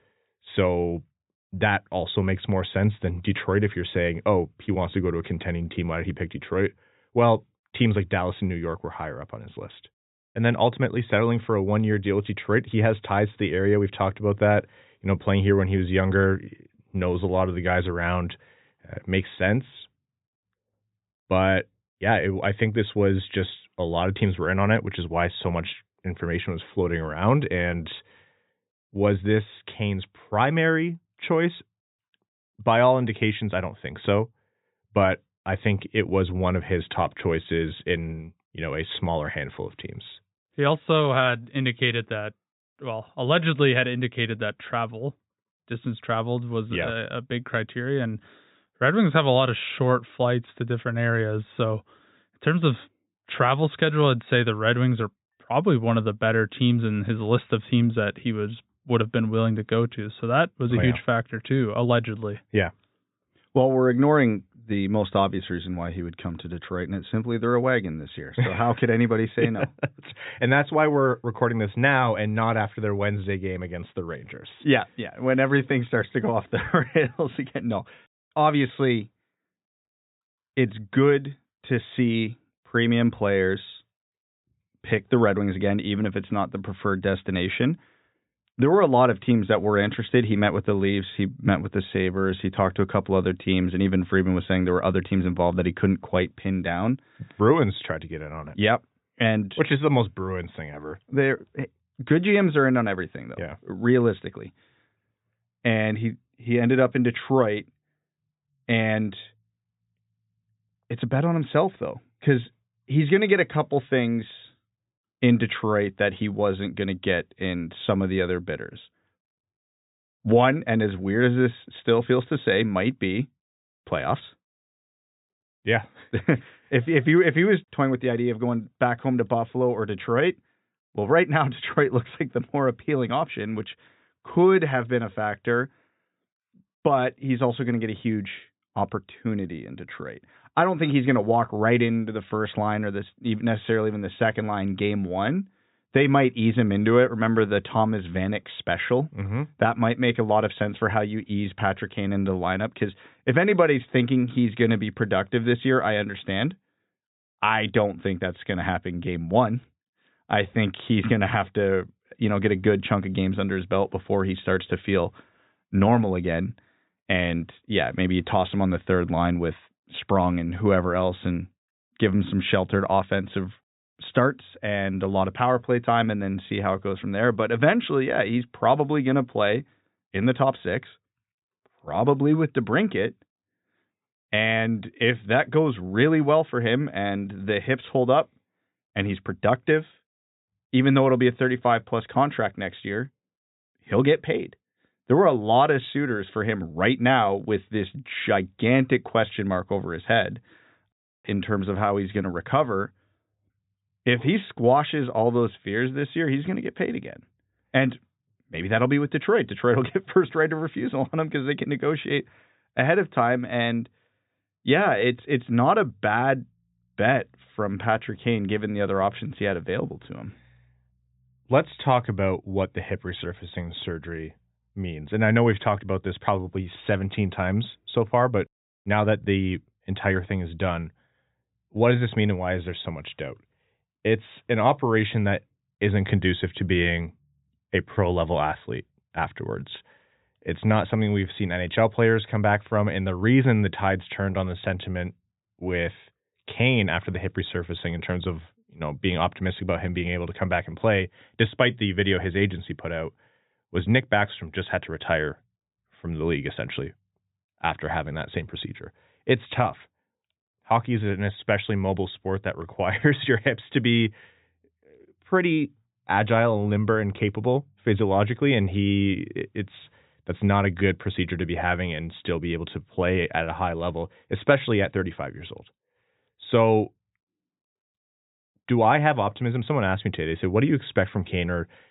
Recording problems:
high frequencies cut off; severe; nothing above 4 kHz

